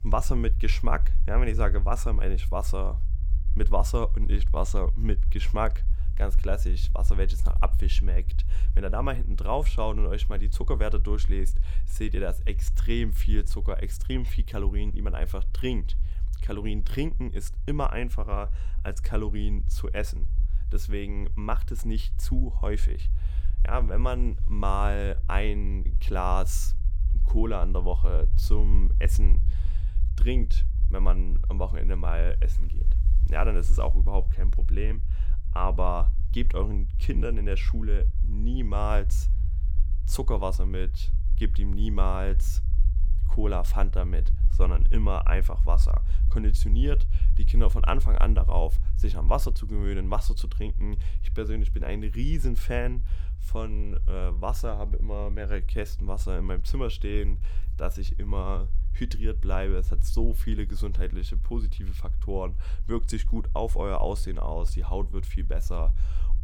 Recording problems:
low rumble; noticeable; throughout; 15 dB below the speech

